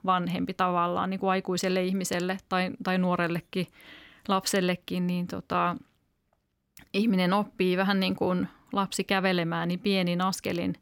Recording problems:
none

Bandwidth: 17 kHz